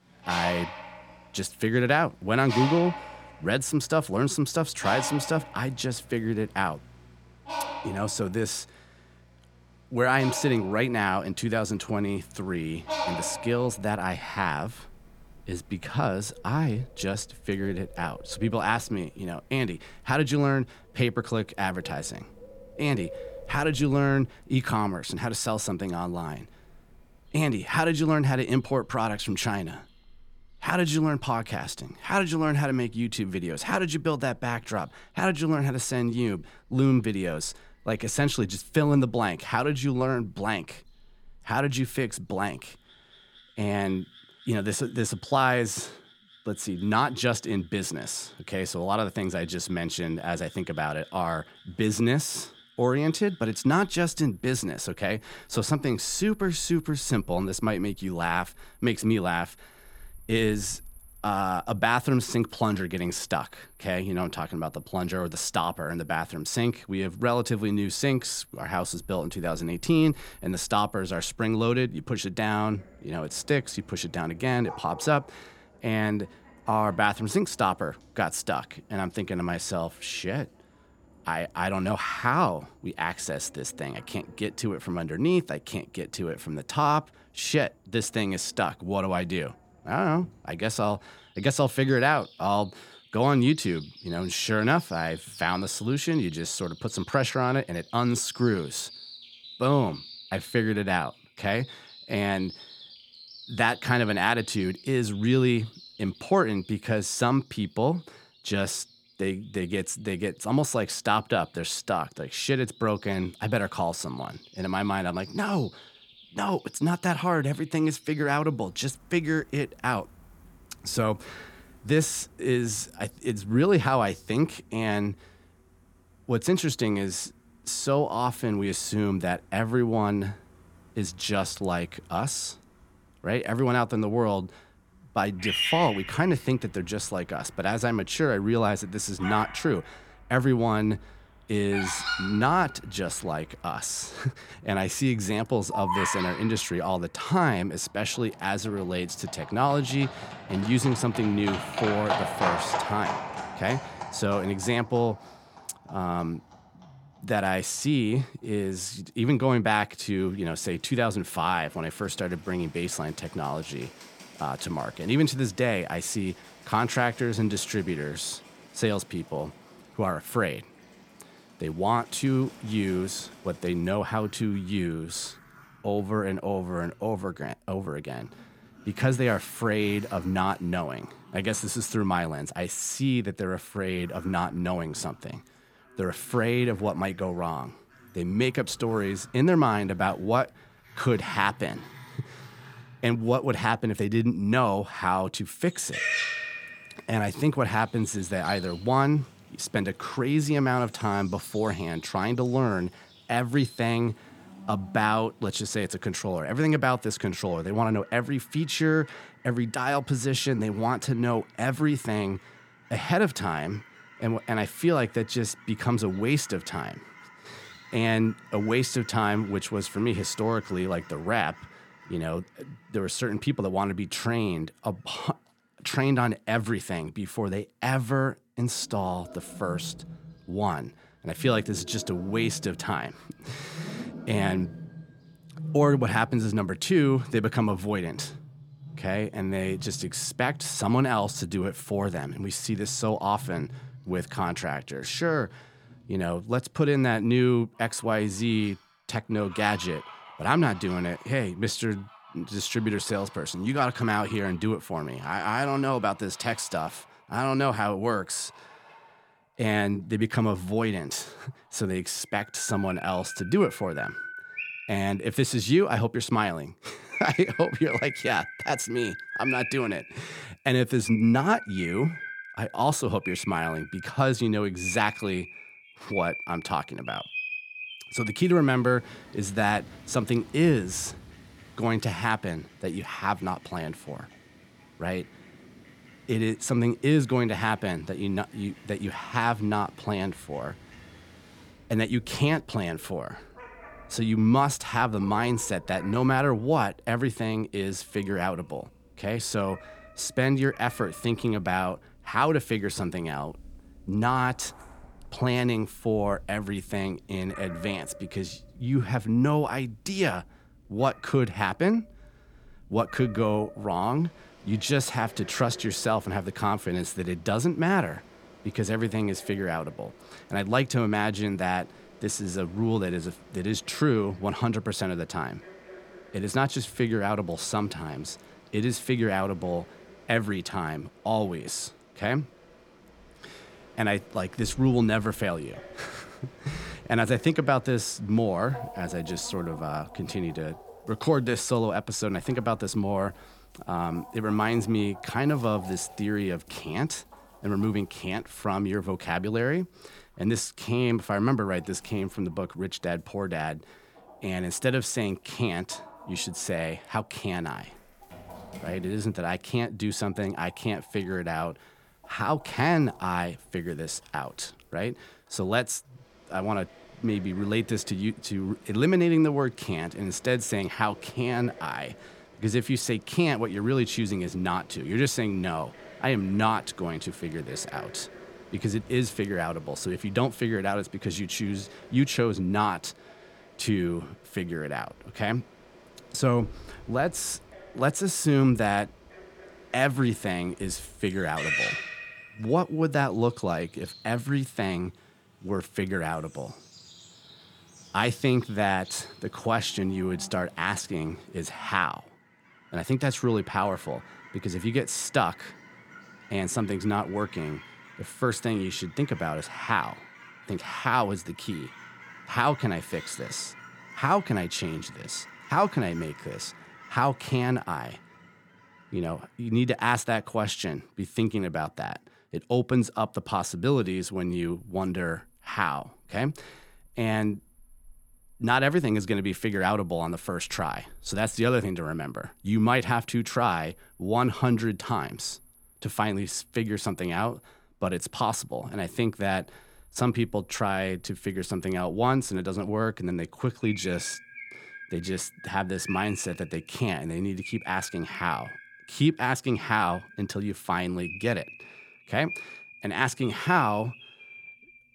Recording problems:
animal sounds; noticeable; throughout; 15 dB below the speech

